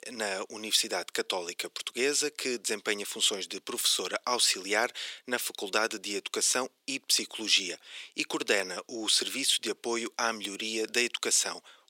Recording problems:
thin; very; fading below 400 Hz

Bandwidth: 16.5 kHz